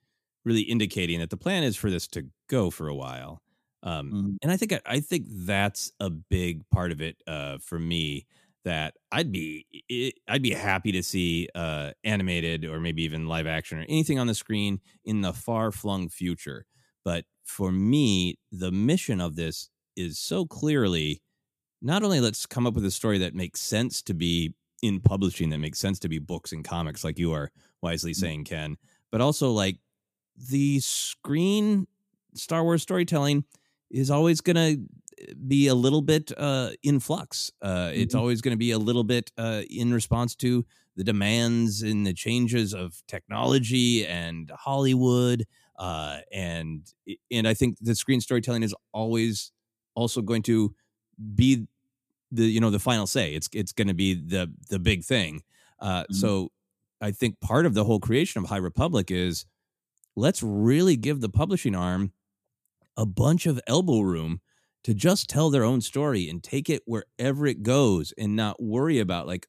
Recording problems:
none

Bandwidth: 14.5 kHz